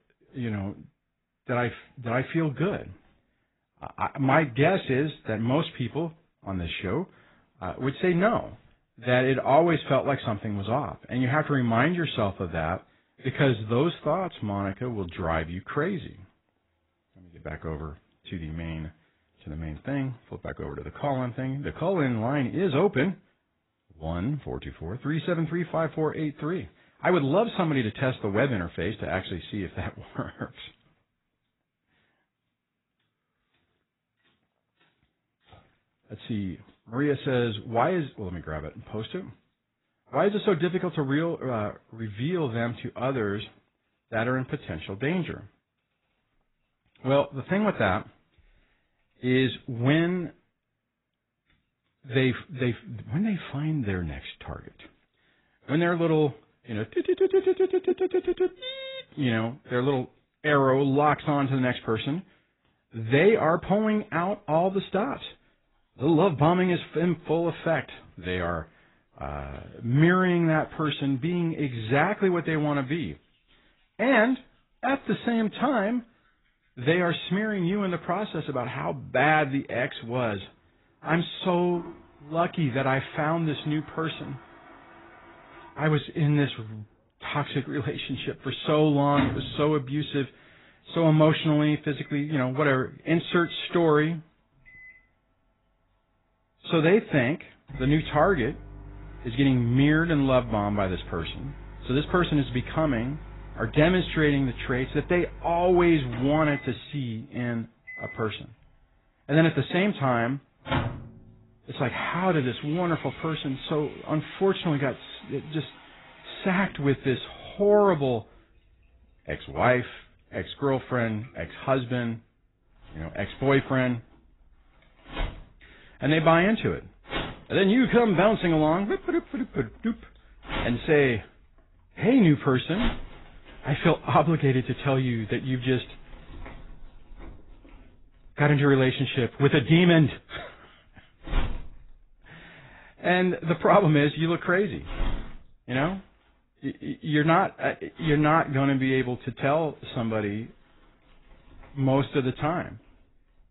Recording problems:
garbled, watery; badly; nothing above 4 kHz
household noises; noticeable; throughout; 15 dB below the speech

